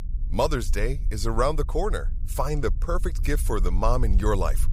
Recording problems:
low rumble; faint; throughout; 20 dB below the speech

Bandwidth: 15.5 kHz